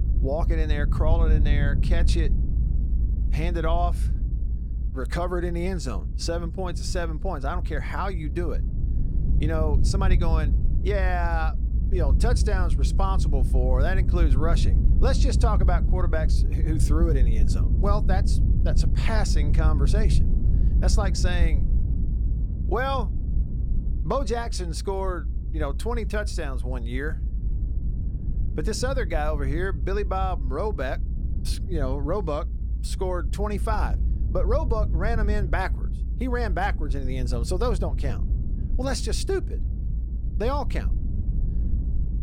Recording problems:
low rumble; noticeable; throughout; 10 dB below the speech

